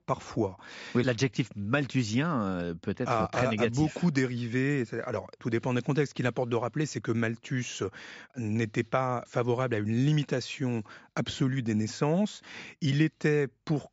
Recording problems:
high frequencies cut off; noticeable; nothing above 7.5 kHz

